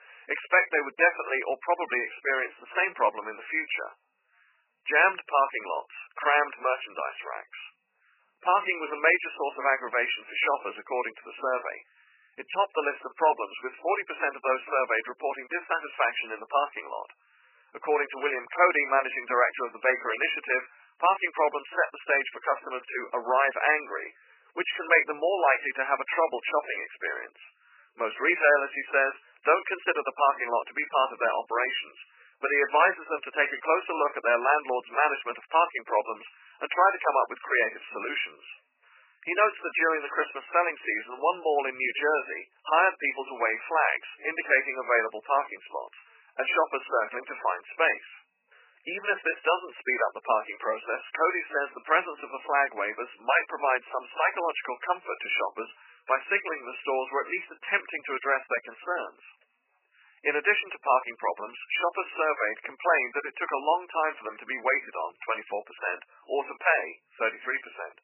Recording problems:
garbled, watery; badly; nothing above 3 kHz
thin; very; fading below 700 Hz

